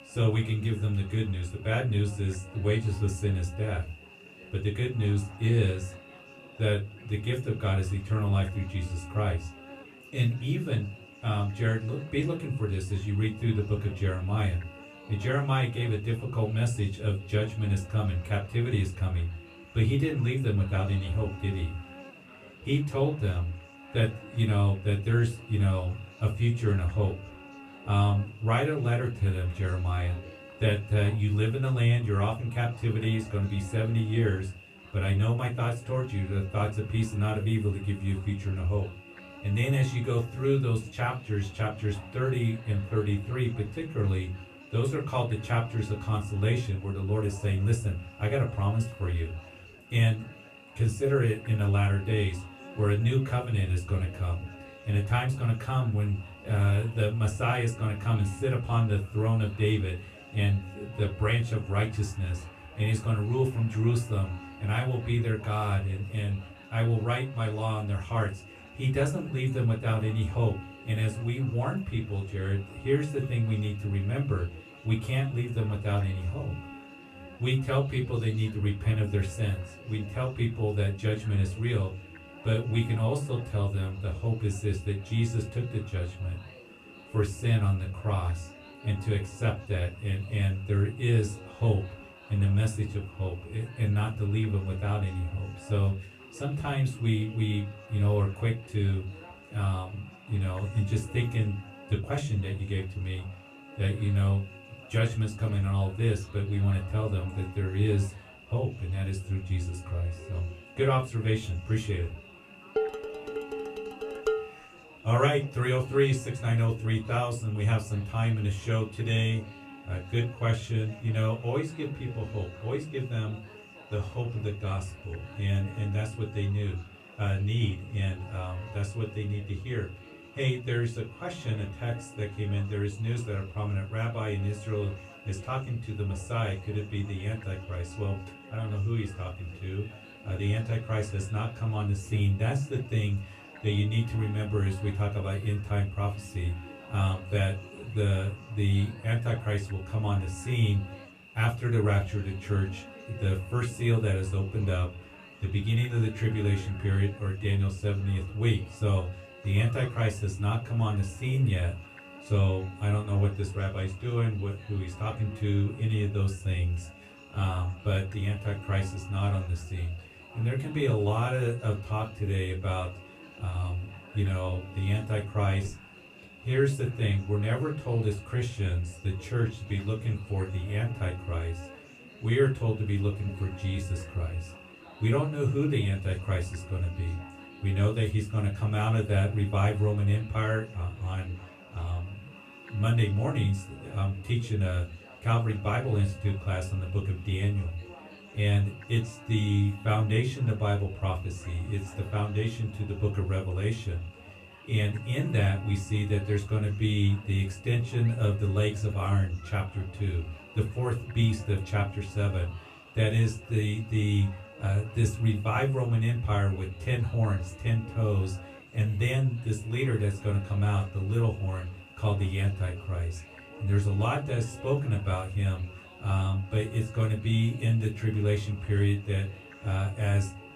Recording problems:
off-mic speech; far
room echo; very slight; dies away in 0.2 s
electrical hum; noticeable; throughout; 50 Hz, 15 dB below the speech
murmuring crowd; faint; throughout; 25 dB below the speech
clattering dishes; noticeable; from 1:53 to 1:54; peak 1 dB below the speech

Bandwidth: 13.5 kHz